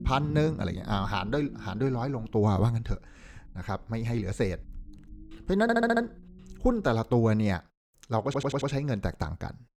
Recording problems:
low rumble; faint; until 7 s; 20 dB below the speech
audio stuttering; at 5.5 s and at 8.5 s

